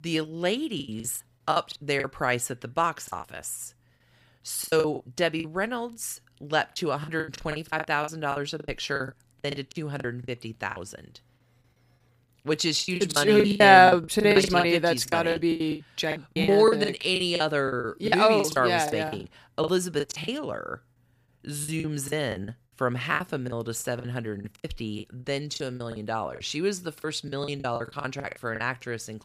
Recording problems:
choppy; very; 16% of the speech affected

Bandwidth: 15 kHz